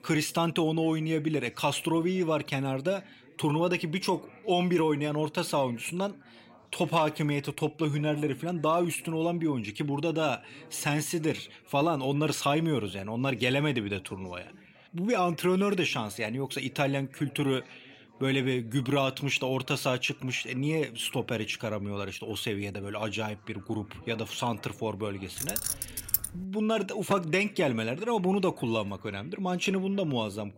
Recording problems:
background chatter; faint; throughout; 3 voices, 25 dB below the speech
jangling keys; loud; at 25 s; peak 1 dB above the speech

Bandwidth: 16 kHz